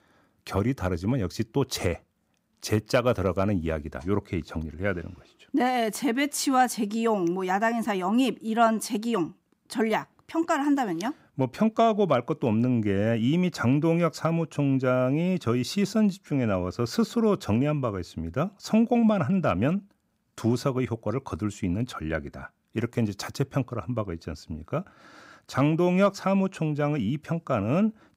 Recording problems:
none

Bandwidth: 15.5 kHz